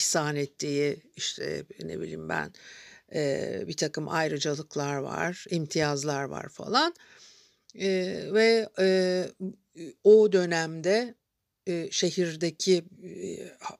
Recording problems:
abrupt cut into speech; at the start

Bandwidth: 15 kHz